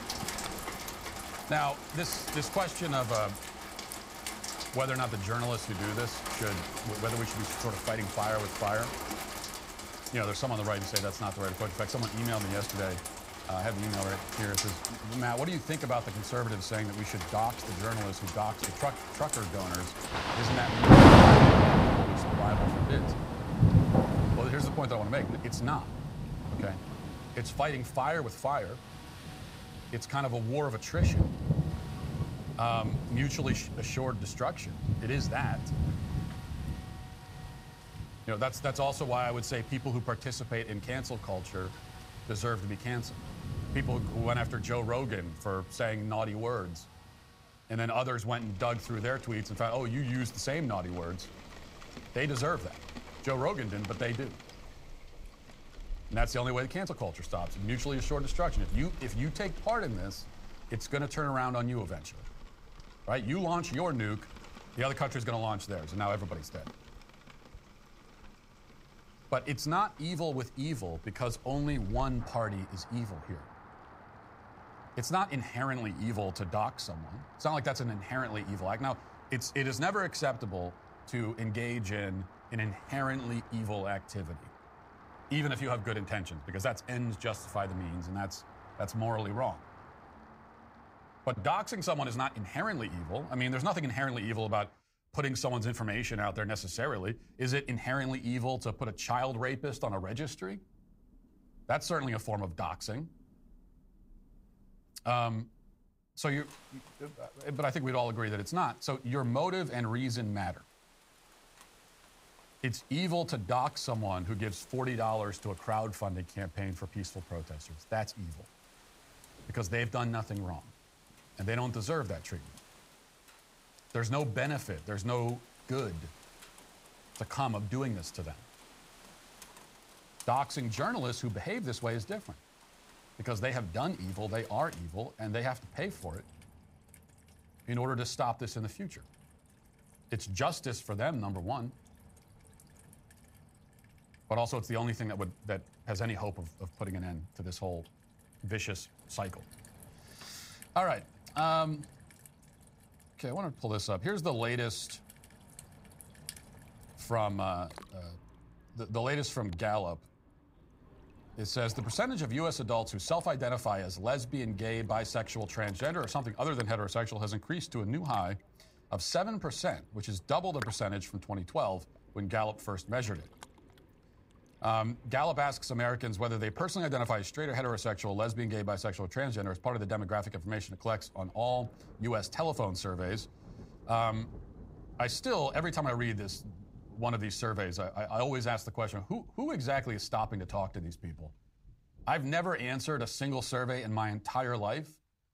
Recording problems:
rain or running water; very loud; throughout; 4 dB above the speech

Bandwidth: 15.5 kHz